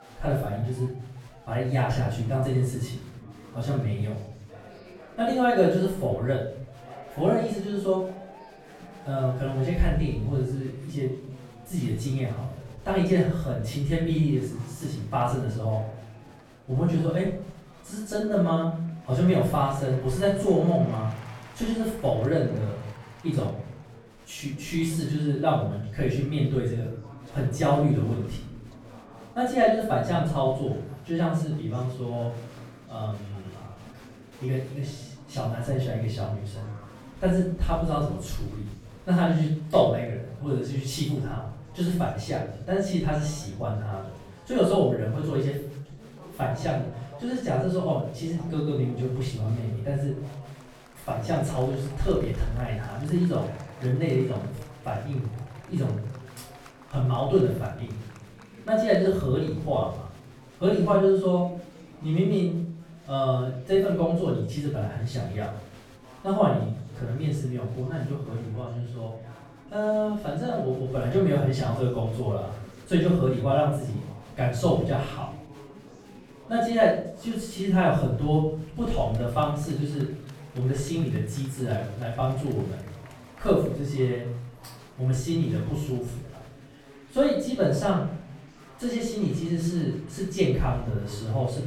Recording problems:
off-mic speech; far
room echo; noticeable; dies away in 0.6 s
murmuring crowd; faint; throughout; 20 dB below the speech

